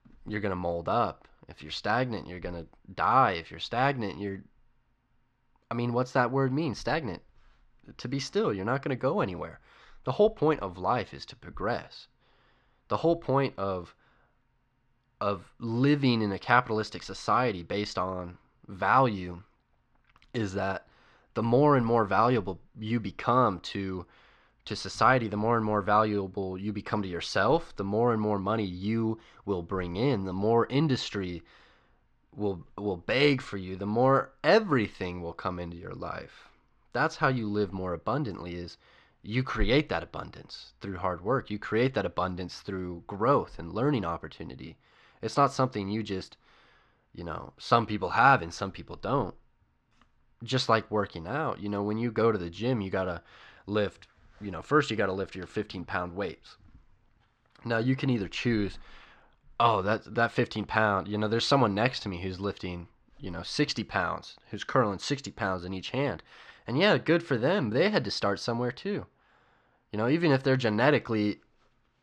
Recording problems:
muffled; very slightly; fading above 5 kHz

